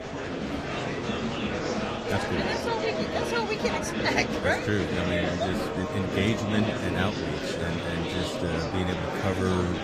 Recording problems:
garbled, watery; slightly; nothing above 14.5 kHz
murmuring crowd; loud; throughout; 1 dB below the speech

